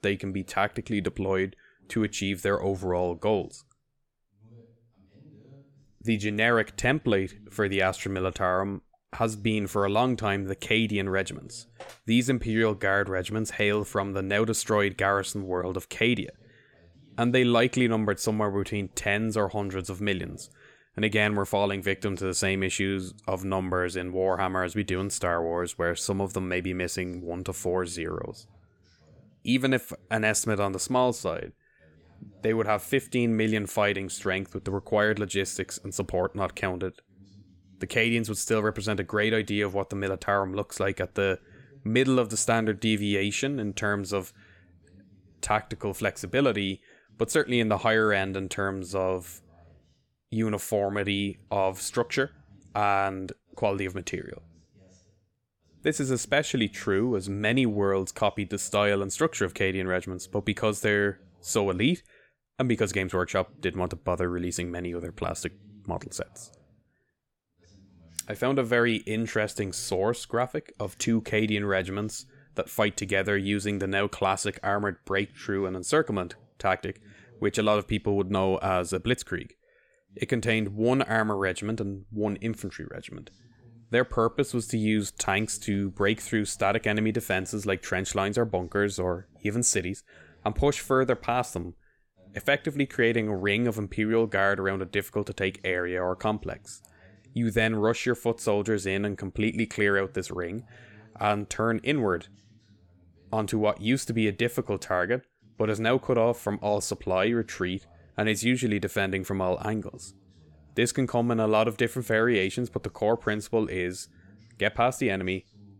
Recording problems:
voice in the background; faint; throughout; 30 dB below the speech

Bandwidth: 17.5 kHz